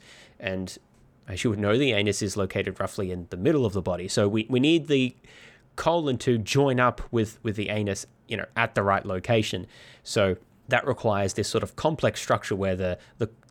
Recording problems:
none

